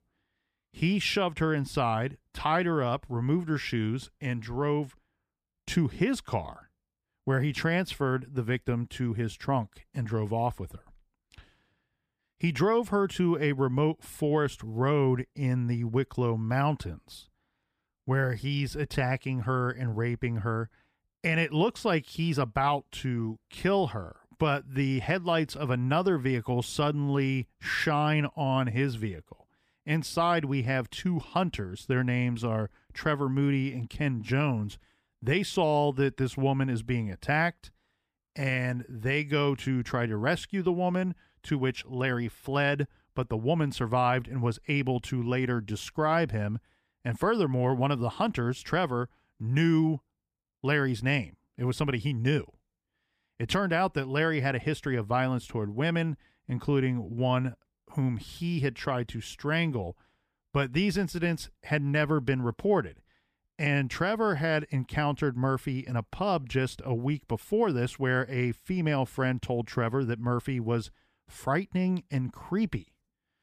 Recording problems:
none

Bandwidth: 15 kHz